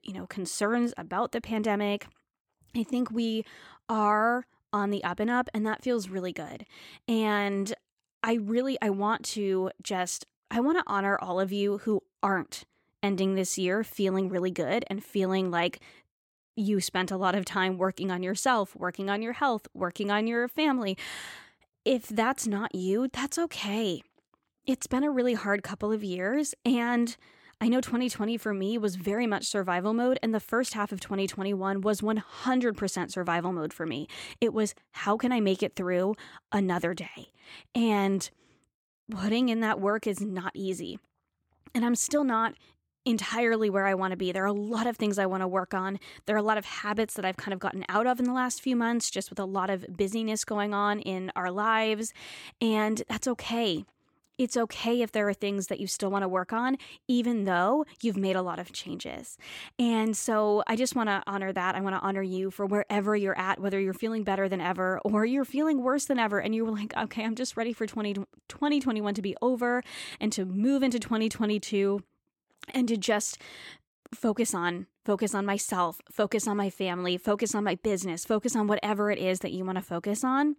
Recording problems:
none

